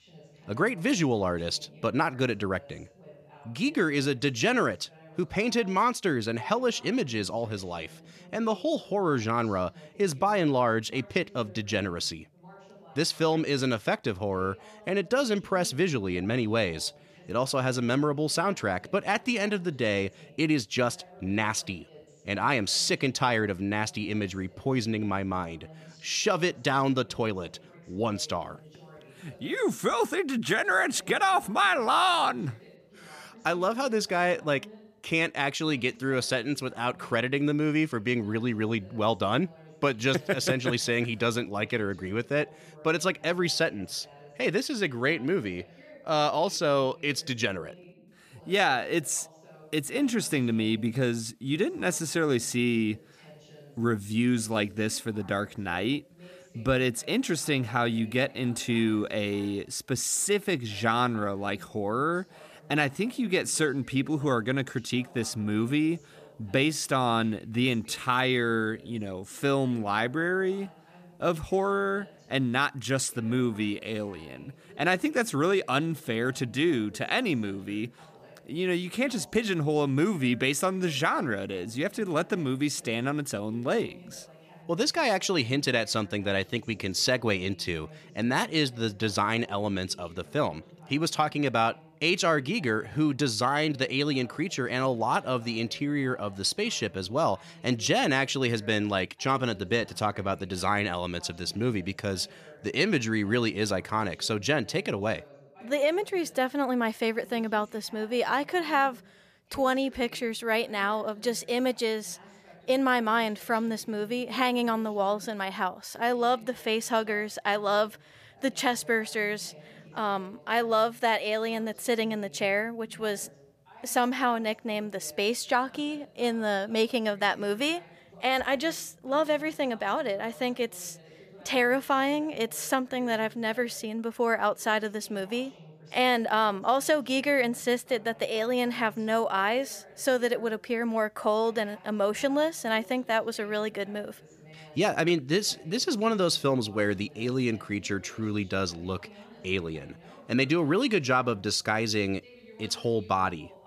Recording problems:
voice in the background; faint; throughout; 25 dB below the speech

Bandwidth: 14.5 kHz